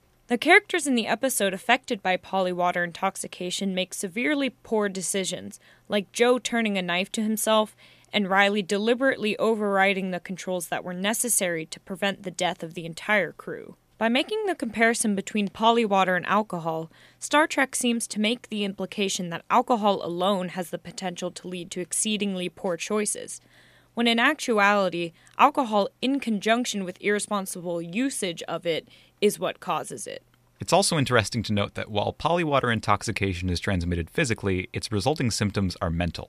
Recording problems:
none

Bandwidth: 14.5 kHz